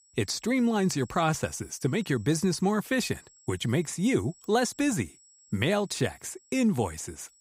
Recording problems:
high-pitched whine; faint; throughout; 7.5 kHz, 30 dB below the speech

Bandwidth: 15.5 kHz